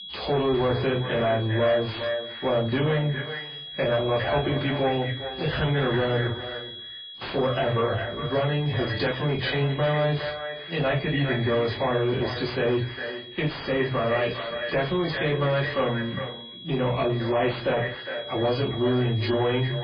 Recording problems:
echo of what is said; strong; throughout; 410 ms later, 9 dB below the speech
off-mic speech; far
garbled, watery; badly; nothing above 5 kHz
distortion; slight; 10 dB below the speech
room echo; very slight; dies away in 0.2 s
high-pitched whine; noticeable; throughout; 3.5 kHz, 10 dB below the speech

